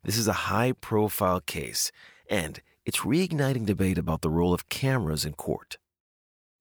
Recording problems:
none

